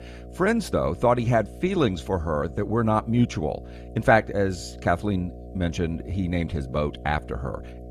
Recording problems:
electrical hum; faint; throughout; 60 Hz, 20 dB below the speech

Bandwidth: 15 kHz